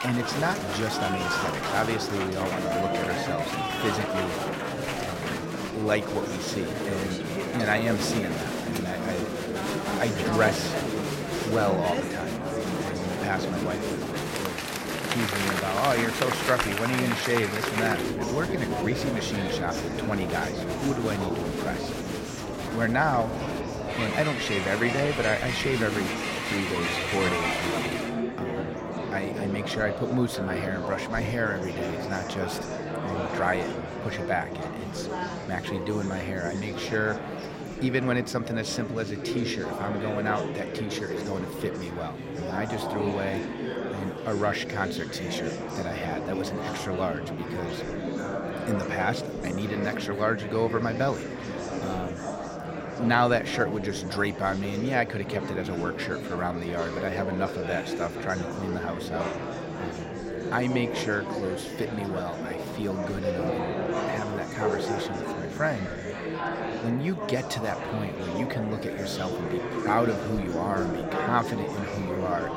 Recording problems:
murmuring crowd; loud; throughout; 1 dB below the speech

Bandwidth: 16 kHz